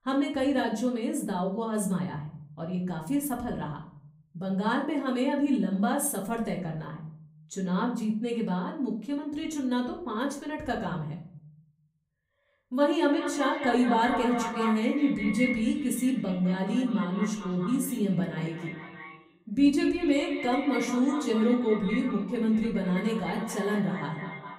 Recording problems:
echo of what is said; strong; from 13 s on; 210 ms later, 8 dB below the speech
off-mic speech; far
room echo; slight; dies away in 0.5 s

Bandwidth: 15.5 kHz